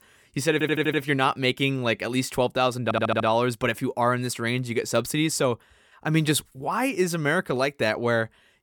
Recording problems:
audio stuttering; at 0.5 s and at 3 s

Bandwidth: 18 kHz